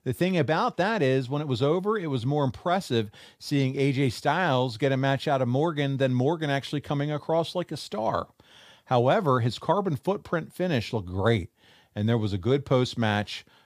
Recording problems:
none

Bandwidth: 15 kHz